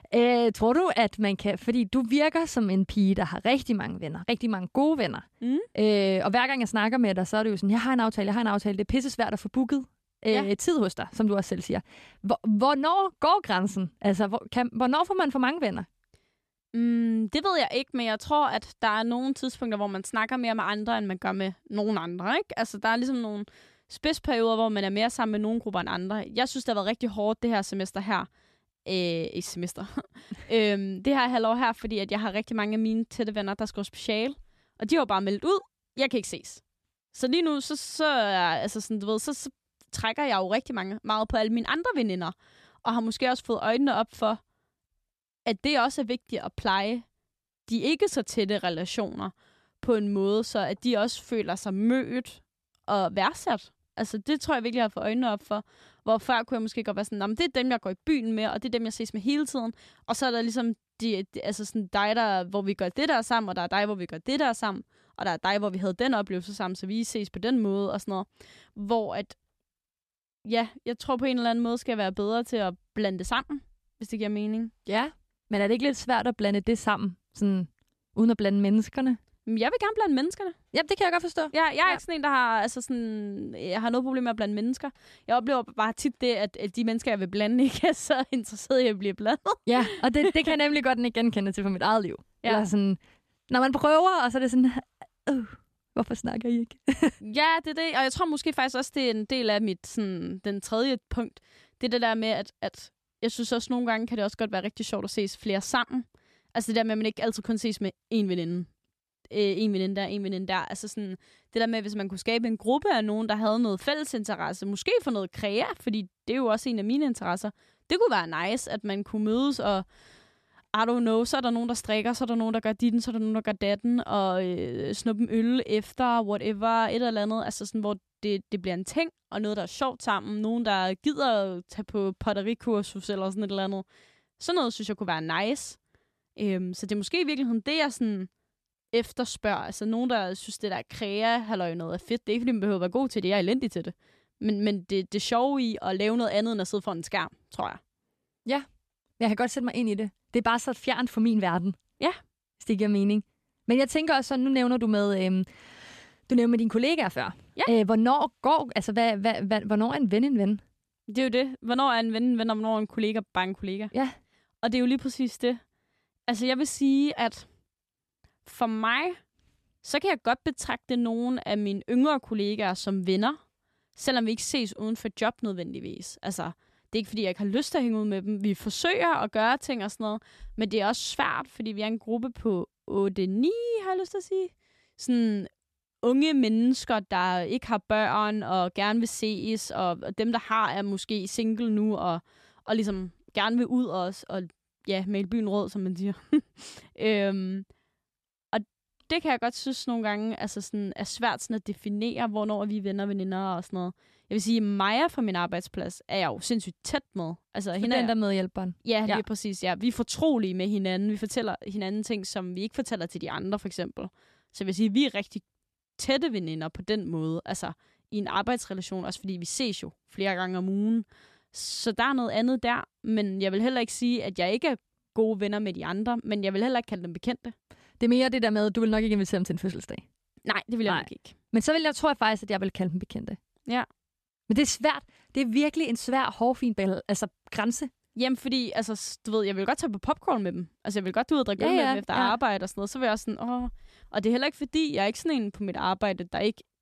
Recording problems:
none

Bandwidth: 13.5 kHz